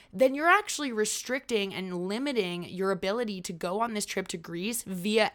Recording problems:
none

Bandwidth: 18 kHz